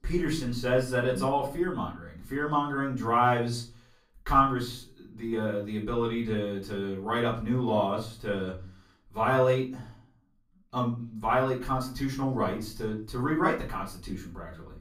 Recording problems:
off-mic speech; far
room echo; slight; dies away in 0.3 s

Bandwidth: 15.5 kHz